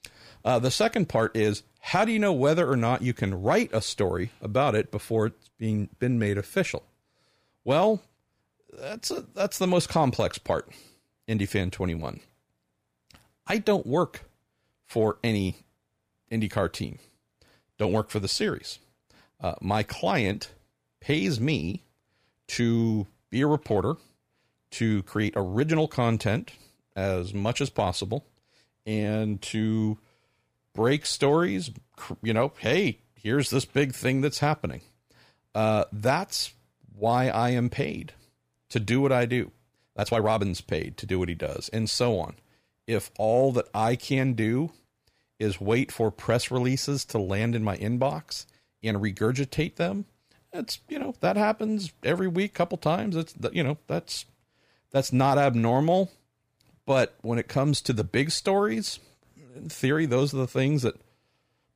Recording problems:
uneven, jittery; strongly; from 6 to 49 s

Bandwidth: 15 kHz